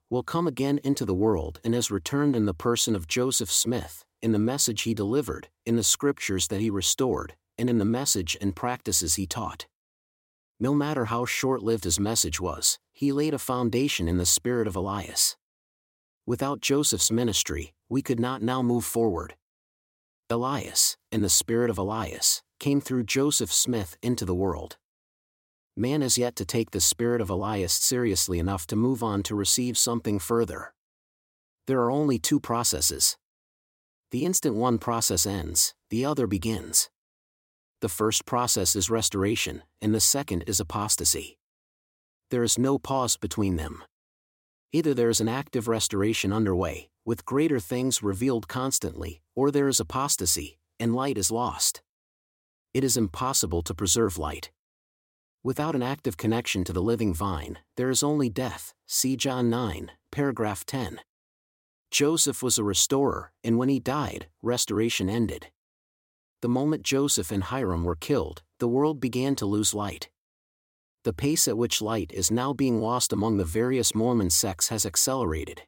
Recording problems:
none

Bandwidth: 16.5 kHz